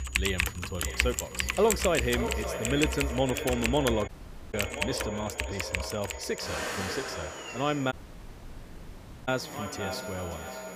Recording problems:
echo of what is said; strong; throughout; 580 ms later, 8 dB below the speech
household noises; loud; throughout; 1 dB below the speech
electrical hum; noticeable; until 3.5 s and from 6.5 s on; 60 Hz, 20 dB below the speech
high-pitched whine; noticeable; throughout; 7 kHz, 15 dB below the speech
audio cutting out; at 4 s and at 8 s for 1.5 s

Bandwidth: 15 kHz